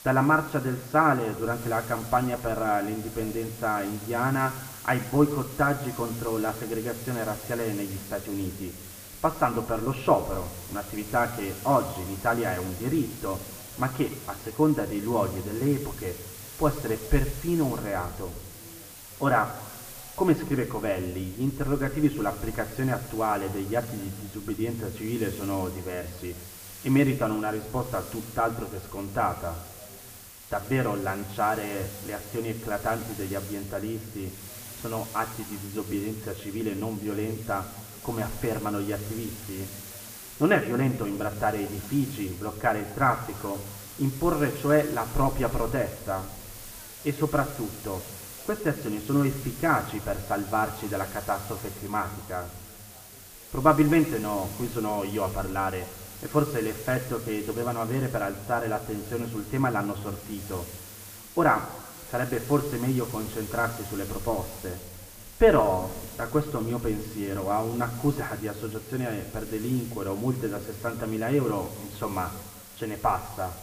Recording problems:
muffled; very; fading above 2 kHz
room echo; slight; dies away in 2.3 s
off-mic speech; somewhat distant
hiss; noticeable; throughout; 15 dB below the speech
background chatter; faint; throughout; 4 voices, 30 dB below the speech

